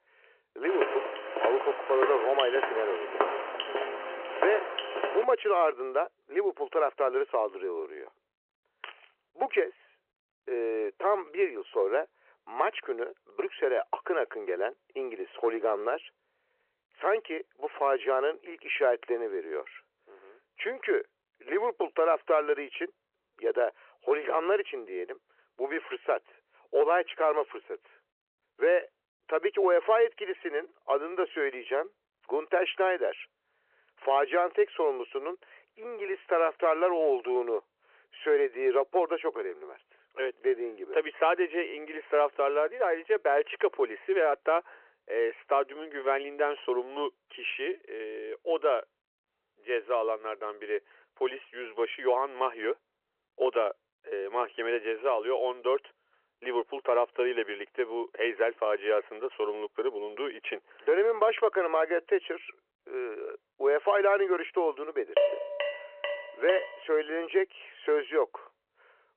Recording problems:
phone-call audio
footsteps; noticeable; from 0.5 to 5 s; peak level with the speech
jangling keys; faint; at 9 s; peak 15 dB below the speech
clattering dishes; loud; from 1:05 to 1:07; peak 3 dB above the speech

